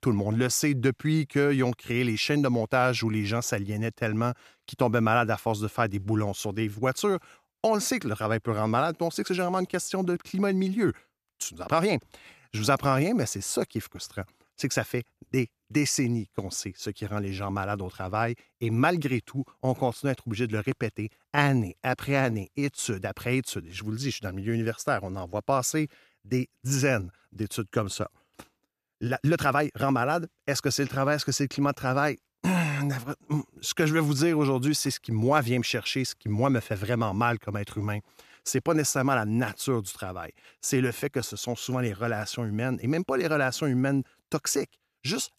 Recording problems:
uneven, jittery; strongly; from 12 to 41 s

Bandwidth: 14 kHz